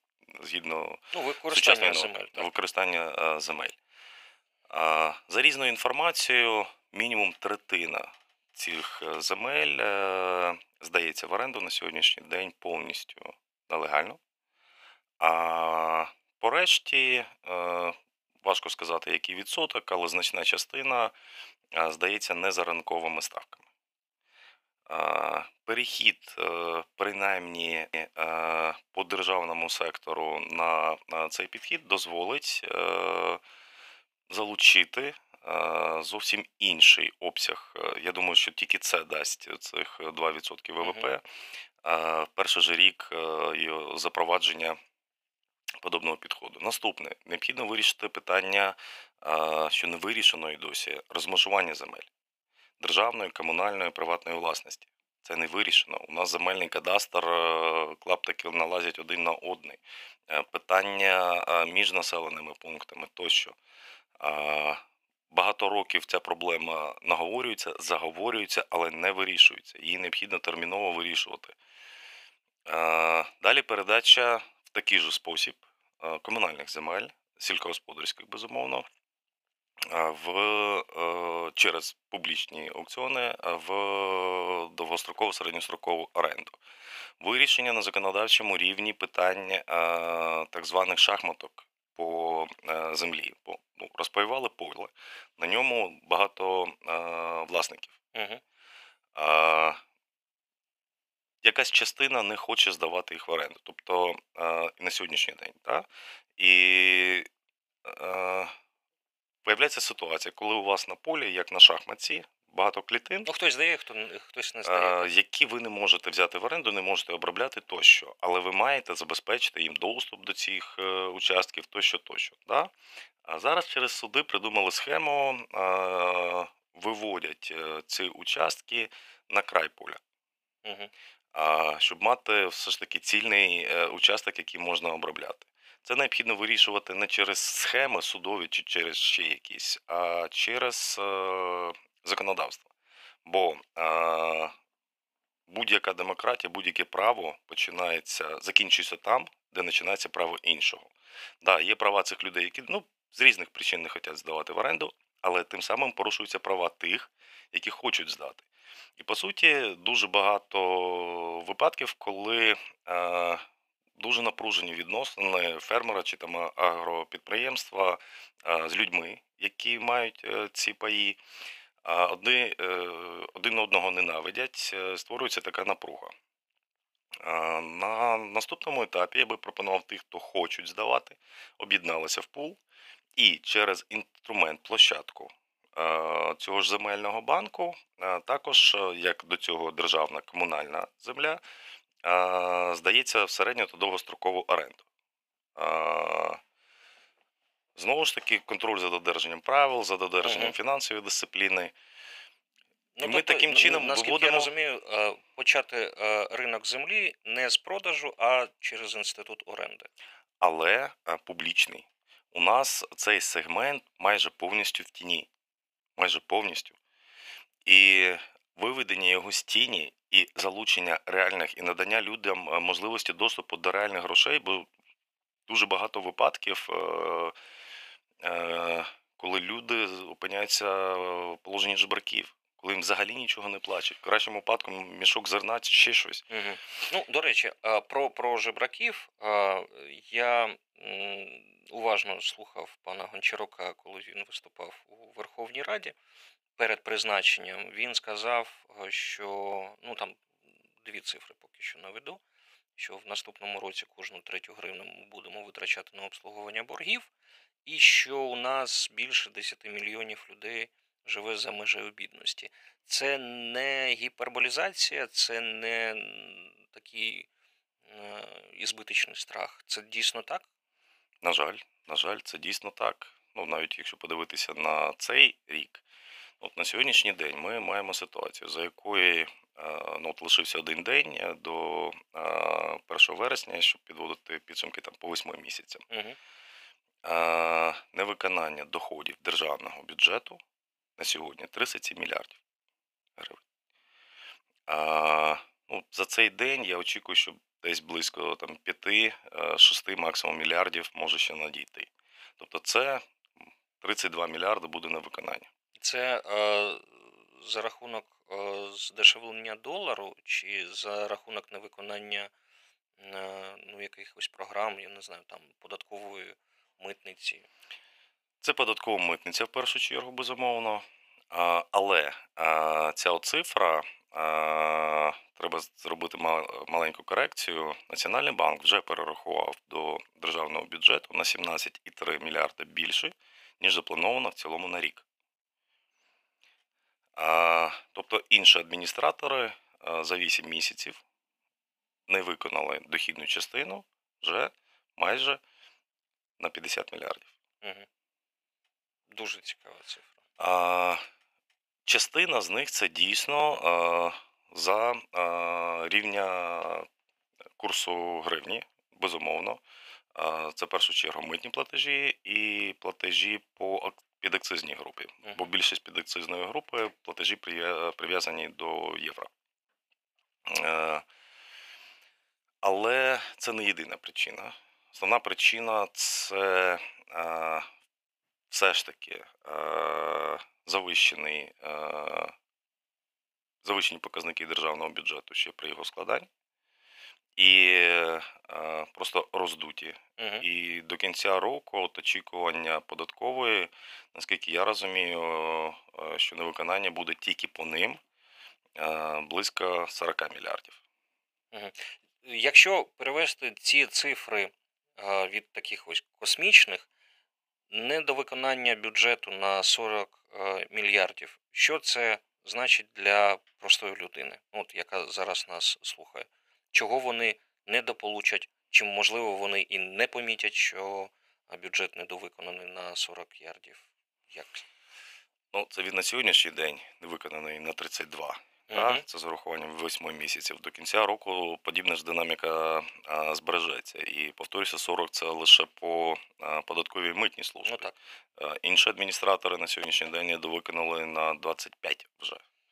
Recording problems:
thin; very; fading below 700 Hz

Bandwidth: 15 kHz